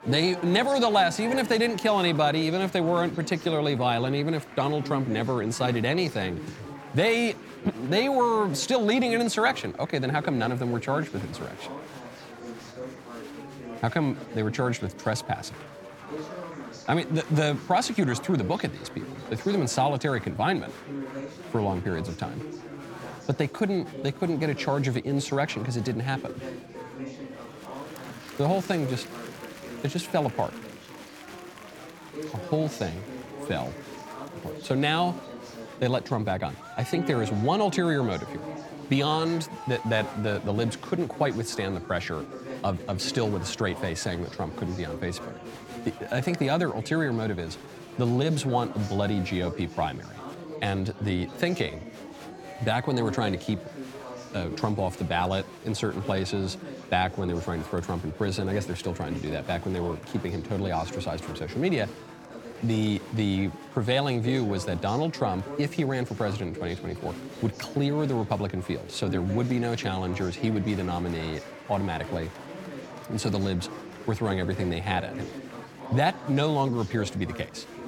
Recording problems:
murmuring crowd; noticeable; throughout; 10 dB below the speech

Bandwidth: 18 kHz